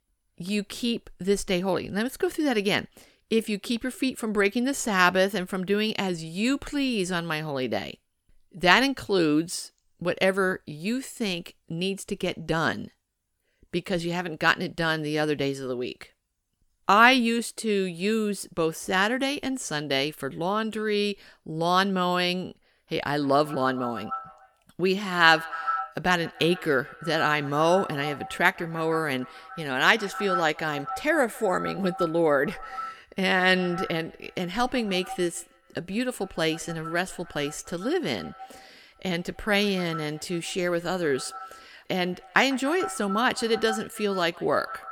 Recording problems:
echo of what is said; strong; from 23 s on; 150 ms later, 10 dB below the speech

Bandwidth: 19 kHz